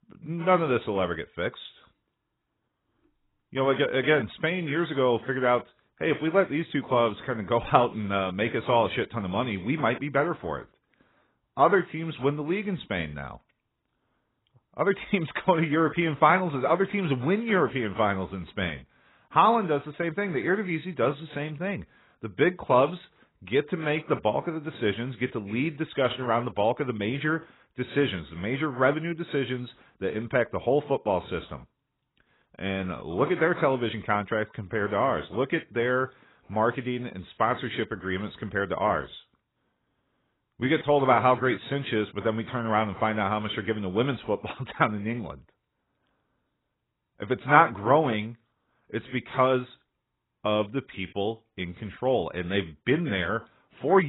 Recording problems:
garbled, watery; badly; nothing above 4 kHz
abrupt cut into speech; at the end

